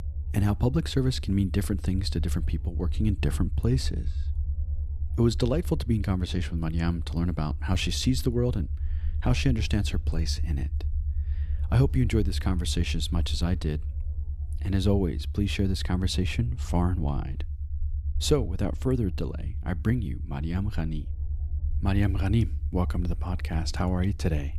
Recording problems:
low rumble; noticeable; throughout; 20 dB below the speech

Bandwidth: 14 kHz